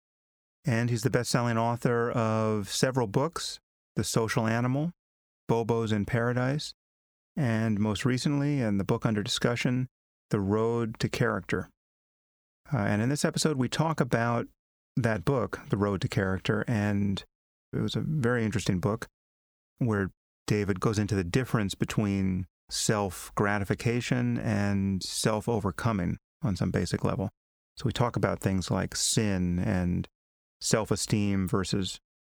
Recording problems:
squashed, flat; somewhat

